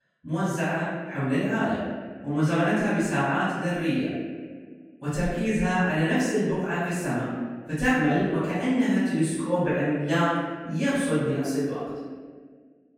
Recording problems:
room echo; strong; dies away in 1.5 s
off-mic speech; far

